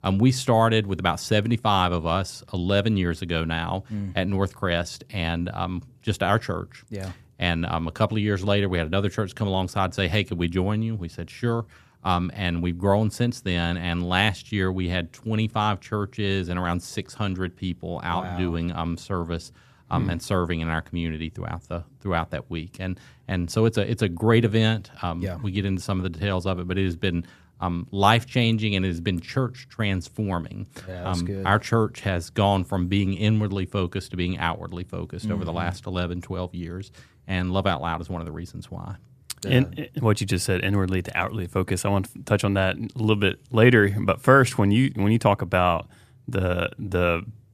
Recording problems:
none

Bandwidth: 14.5 kHz